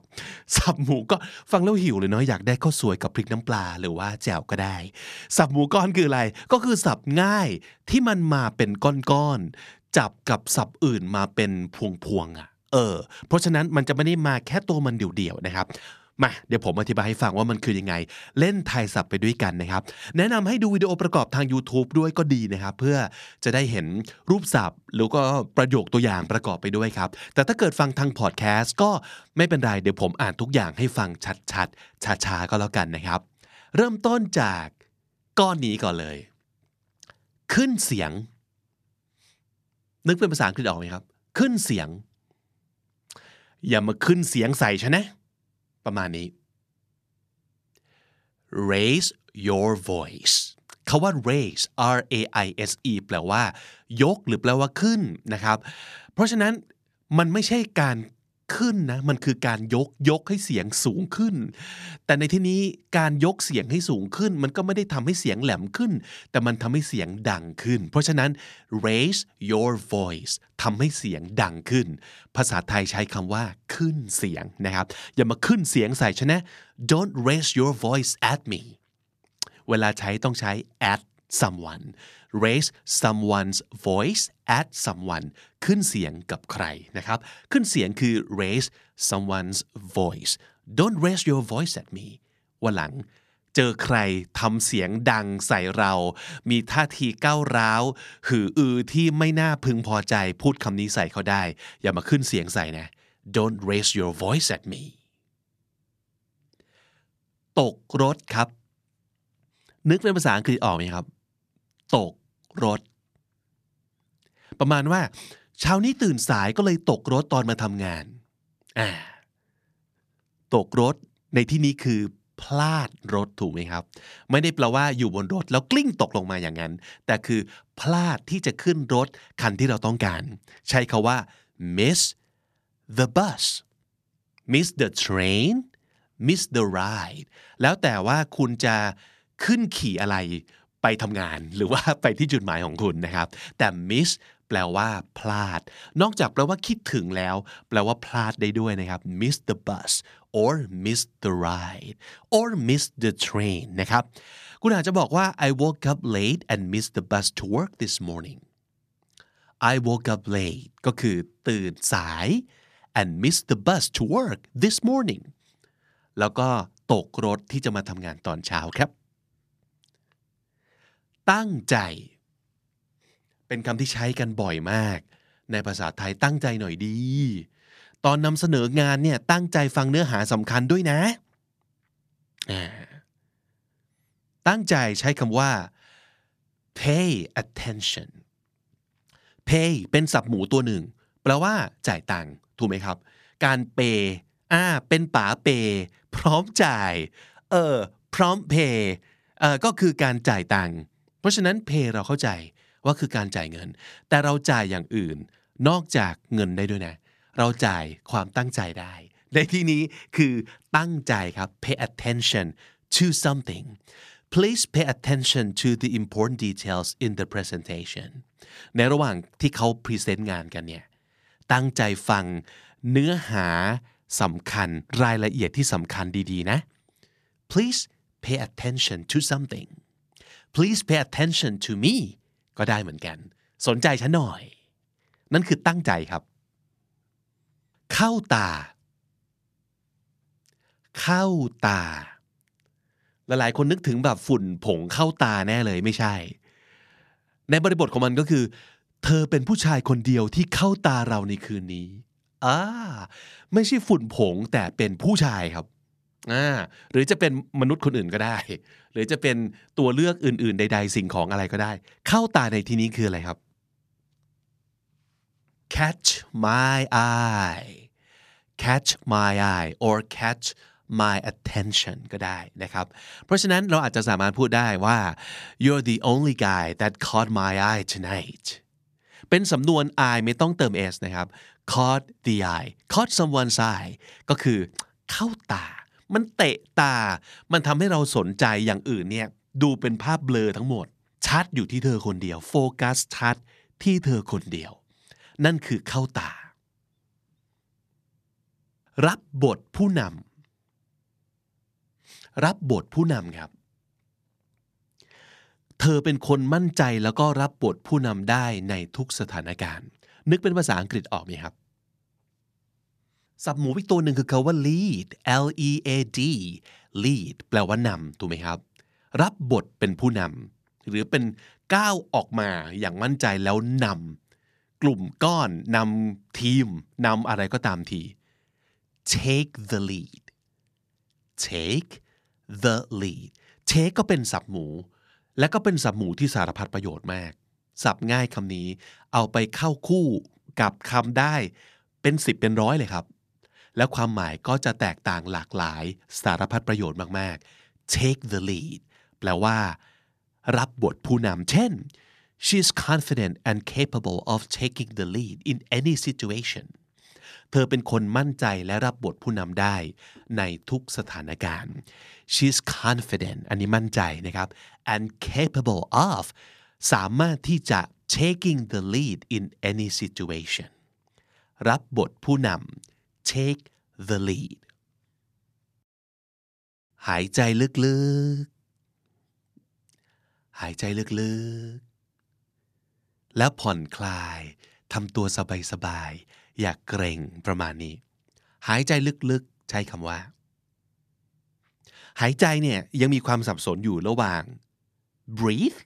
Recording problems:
none

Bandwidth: 14.5 kHz